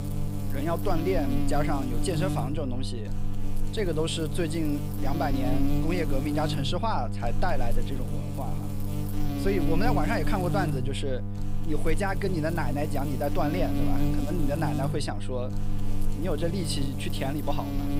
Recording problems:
electrical hum; loud; throughout; 50 Hz, 6 dB below the speech

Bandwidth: 15.5 kHz